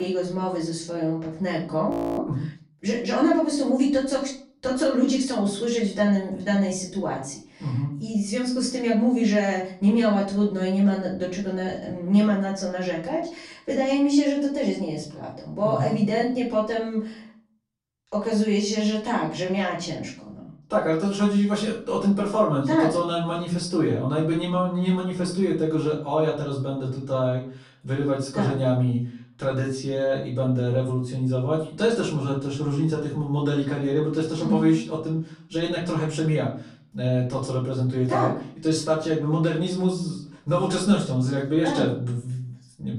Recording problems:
off-mic speech; far
room echo; slight; dies away in 0.5 s
abrupt cut into speech; at the start
audio freezing; at 2 s

